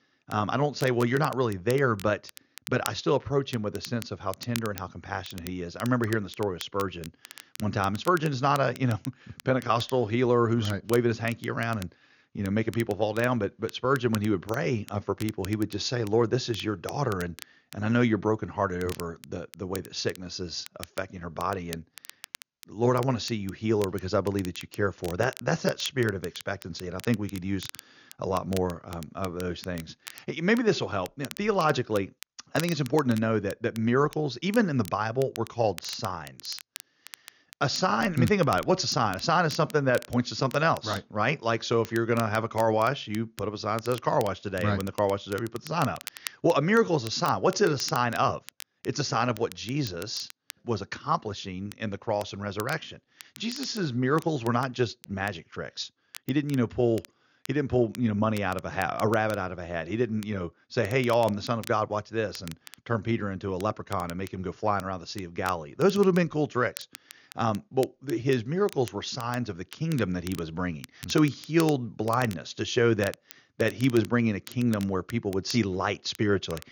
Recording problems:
high frequencies cut off; noticeable; nothing above 7 kHz
crackle, like an old record; noticeable; 20 dB below the speech

